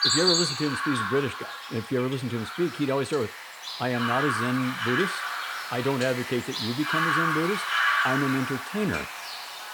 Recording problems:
animal sounds; very loud; throughout; 1 dB above the speech

